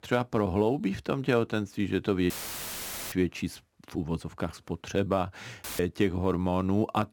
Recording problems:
audio cutting out; filled with static; at 2.5 s for 1 s and at 5.5 s

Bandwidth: 18 kHz